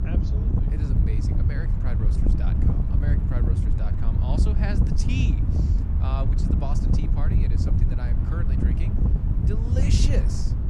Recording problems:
wind noise on the microphone; heavy; 2 dB above the speech
low rumble; faint; throughout; 25 dB below the speech

